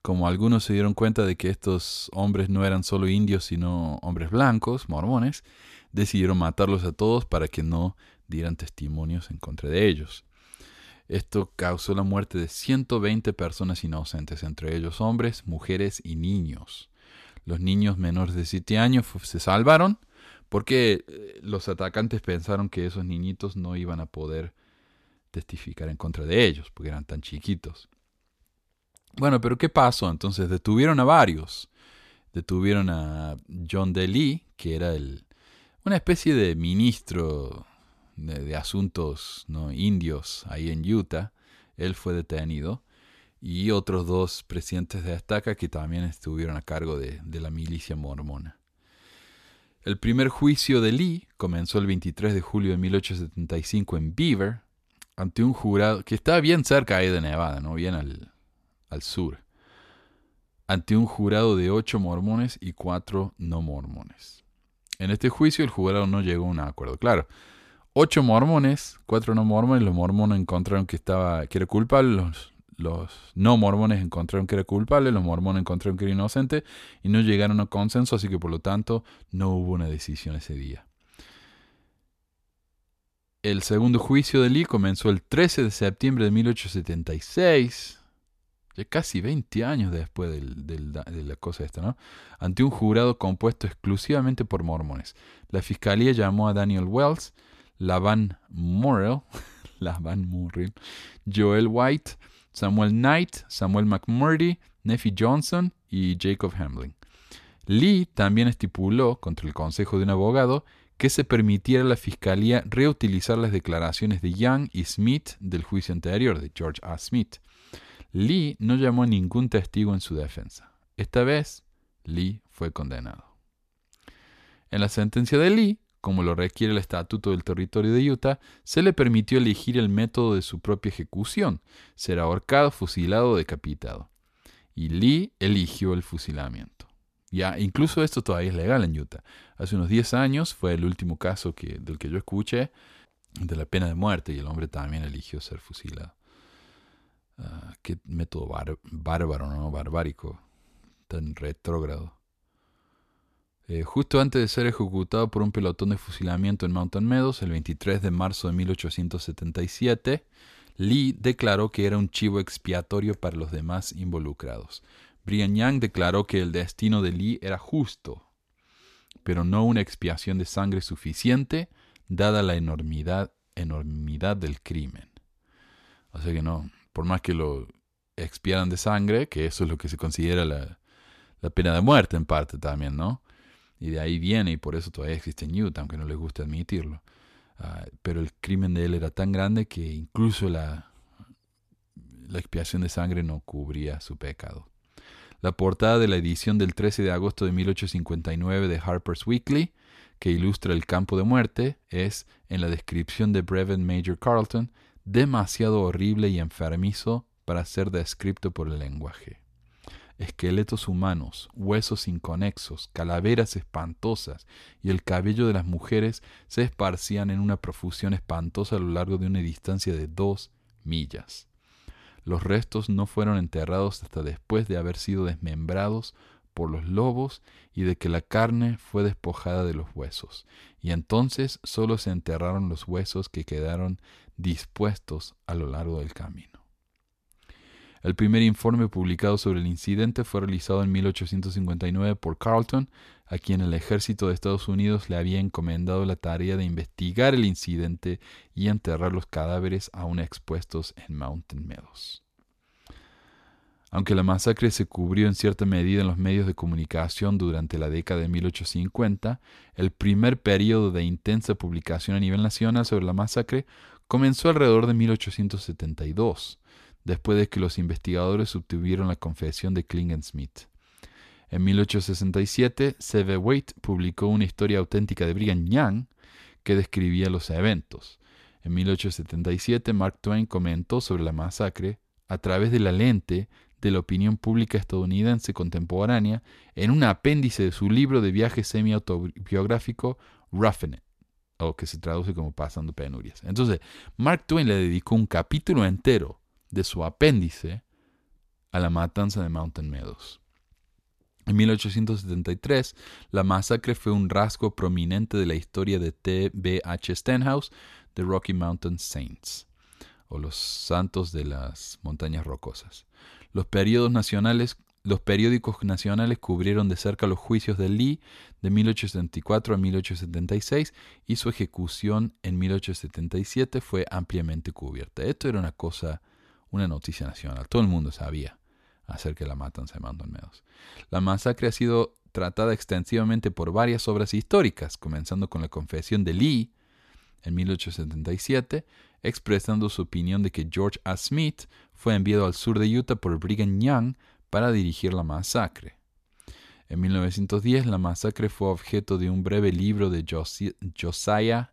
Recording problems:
none

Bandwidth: 14 kHz